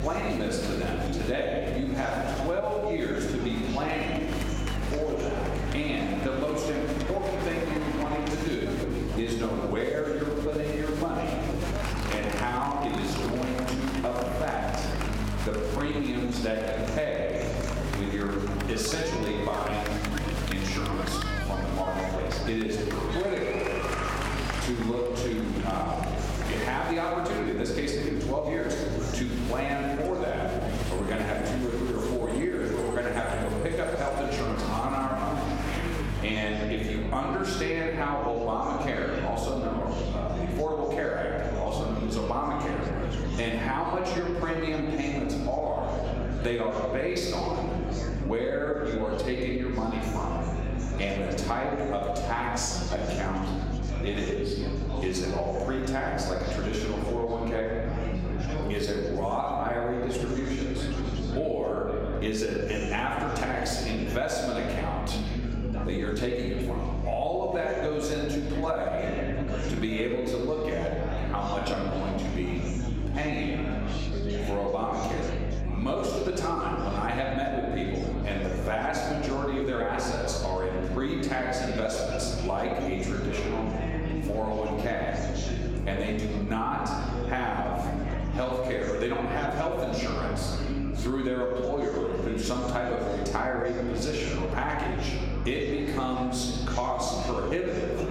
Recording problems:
off-mic speech; far
room echo; noticeable; dies away in 1.2 s
squashed, flat; somewhat
chatter from many people; loud; throughout; 7 dB below the speech
electrical hum; faint; throughout; 50 Hz, 20 dB below the speech

